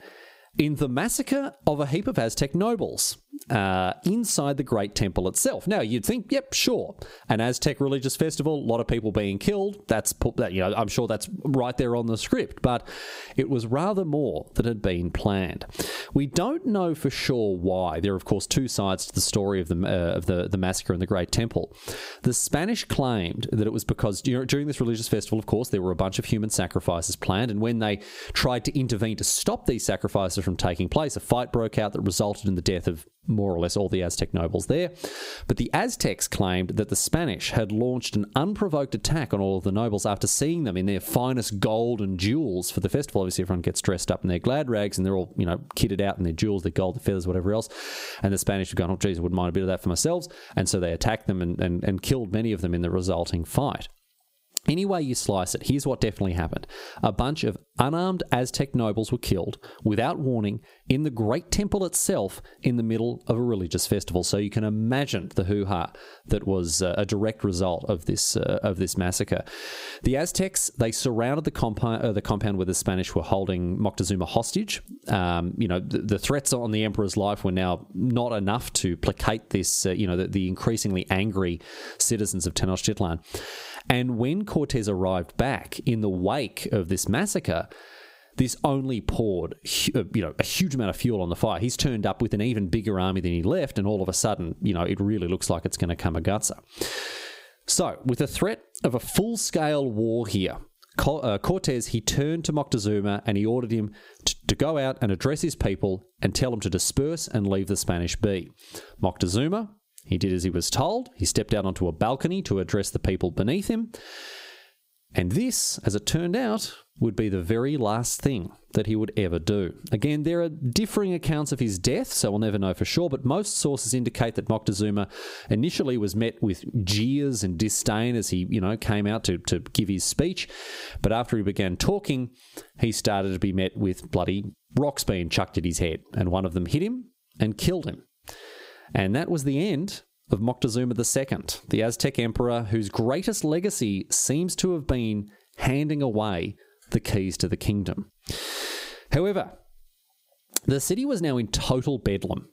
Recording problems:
squashed, flat; somewhat

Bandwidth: 15.5 kHz